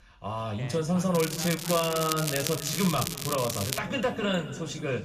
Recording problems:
room echo; slight; dies away in 1.7 s
off-mic speech; somewhat distant
crackling; loud; from 1 to 4 s; 4 dB below the speech
voice in the background; noticeable; throughout; 20 dB below the speech

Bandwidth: 14.5 kHz